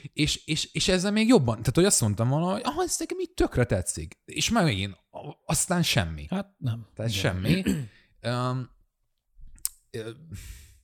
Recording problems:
none

